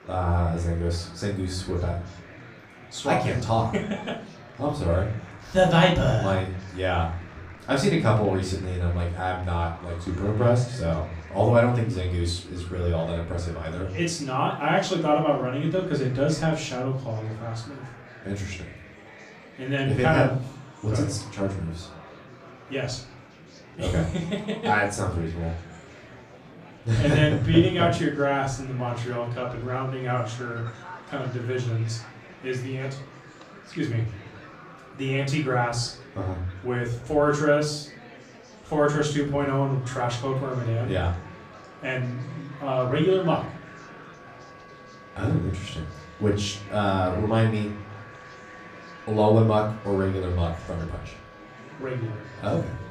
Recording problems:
off-mic speech; far
room echo; slight; dies away in 0.4 s
murmuring crowd; noticeable; throughout; 20 dB below the speech
background music; faint; throughout; 25 dB below the speech

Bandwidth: 15 kHz